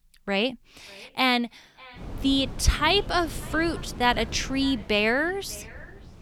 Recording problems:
echo of what is said; faint; throughout; 590 ms later, 25 dB below the speech
wind noise on the microphone; occasional gusts; from 2 s on; 20 dB below the speech

